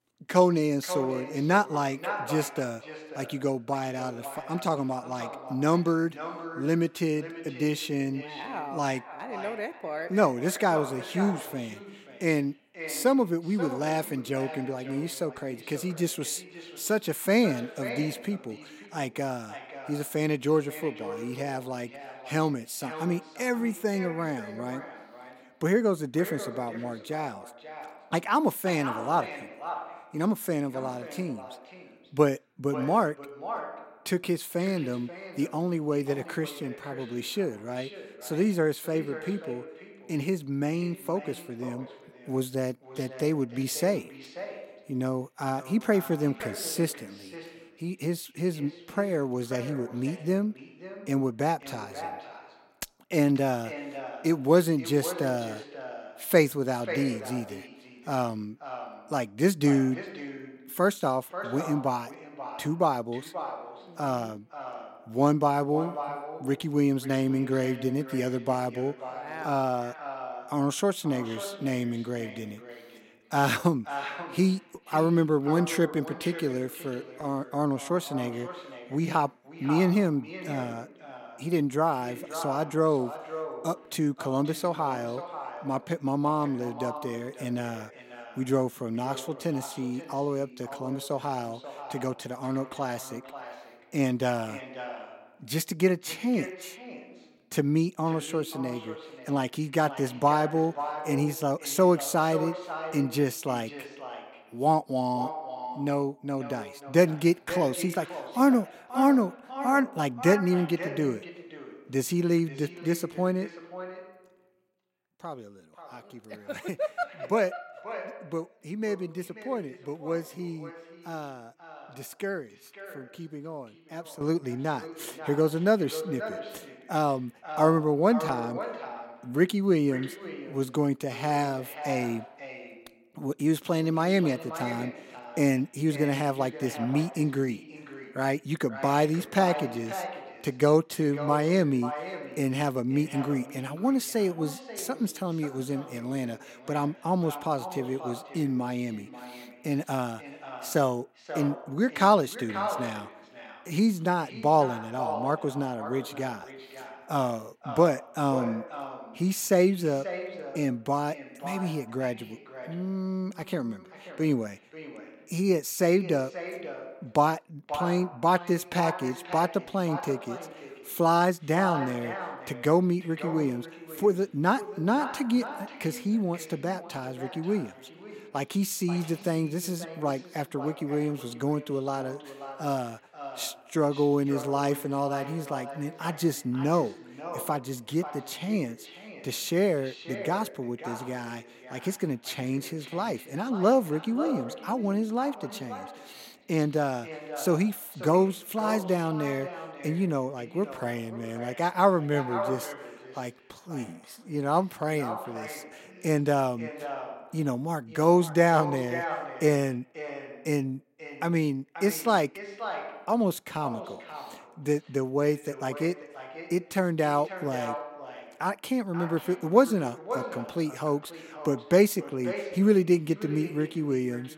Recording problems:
echo of what is said; strong; throughout; 540 ms later, 10 dB below the speech

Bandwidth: 16 kHz